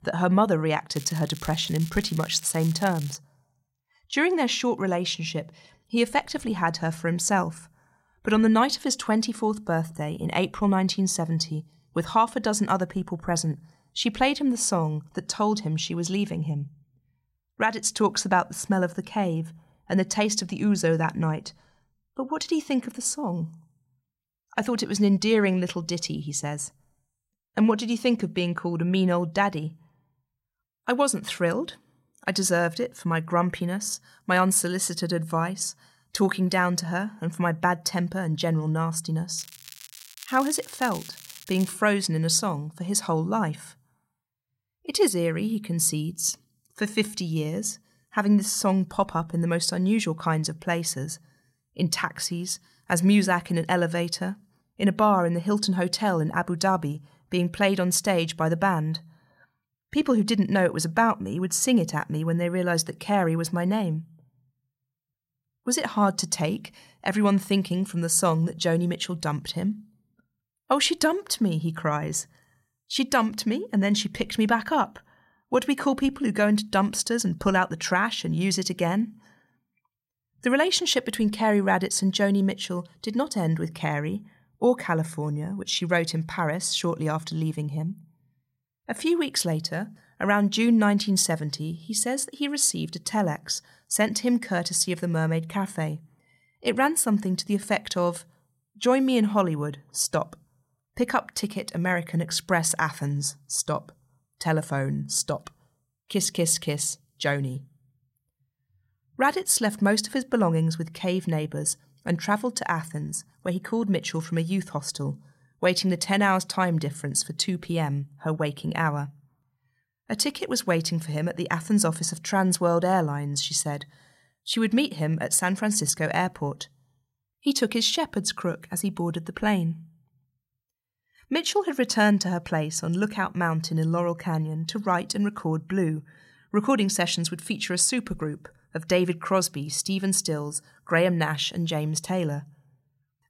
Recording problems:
crackling; noticeable; from 1 to 3 s and from 39 to 42 s; 15 dB below the speech

